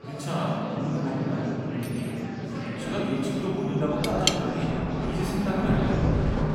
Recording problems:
room echo; strong; dies away in 3 s
off-mic speech; far
background music; loud; throughout; 8 dB below the speech
murmuring crowd; loud; throughout; 7 dB below the speech
rain or running water; very faint; throughout; 2 dB below the speech
clattering dishes; faint; at 2 s; peak 15 dB below the speech
clattering dishes; loud; at 4 s; peak 4 dB above the speech

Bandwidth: 16 kHz